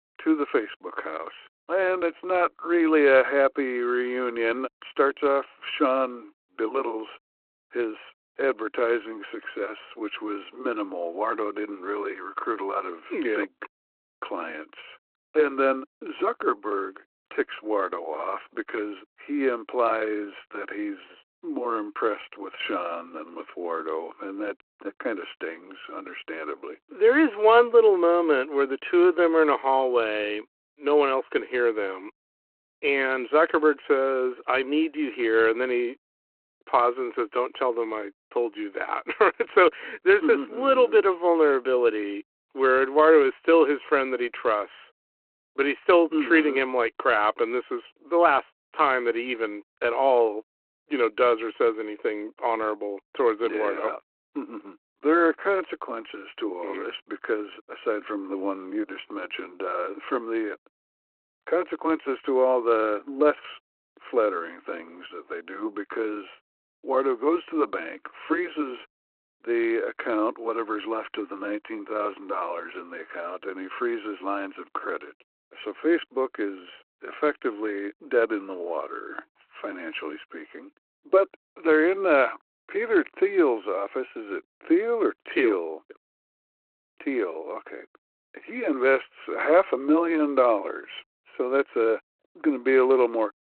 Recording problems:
phone-call audio; nothing above 4 kHz

